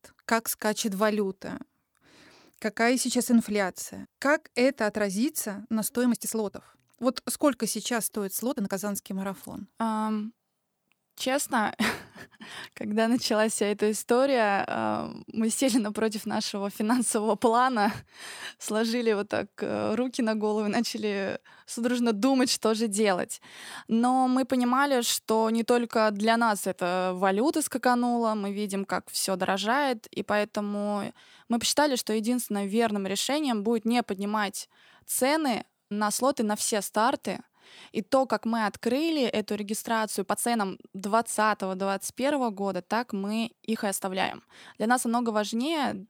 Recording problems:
uneven, jittery; strongly; from 6 to 44 s

